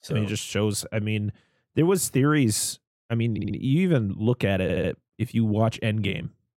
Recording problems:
audio stuttering; at 3.5 s and at 4.5 s

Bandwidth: 16.5 kHz